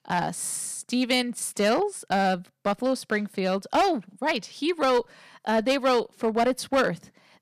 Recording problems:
distortion; slight; 5% of the sound clipped

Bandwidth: 14.5 kHz